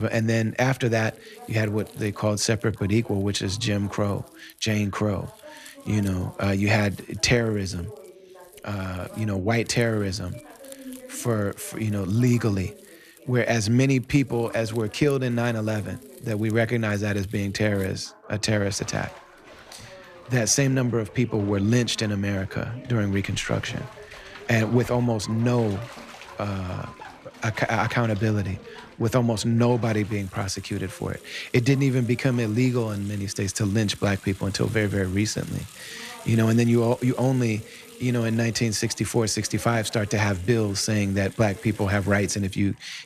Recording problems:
household noises; faint; throughout; 20 dB below the speech
voice in the background; faint; throughout; 25 dB below the speech
abrupt cut into speech; at the start

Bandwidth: 14.5 kHz